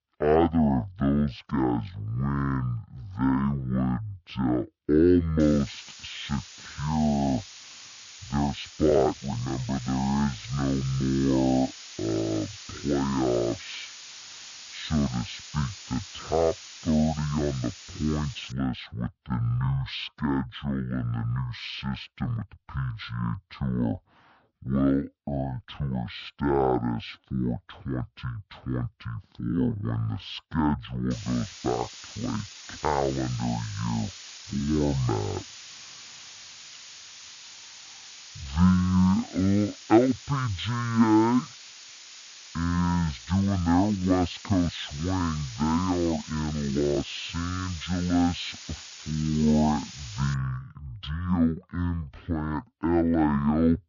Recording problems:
wrong speed and pitch; too slow and too low; 0.5 times normal speed
hiss; noticeable; from 5.5 to 19 s and from 31 to 50 s; 15 dB below the speech
uneven, jittery; strongly; from 5 to 50 s

